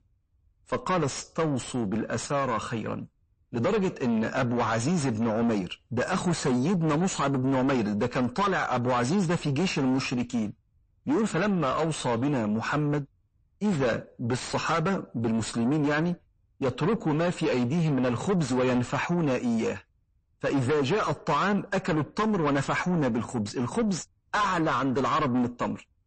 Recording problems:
distortion; heavy; 6 dB below the speech
garbled, watery; slightly; nothing above 8 kHz

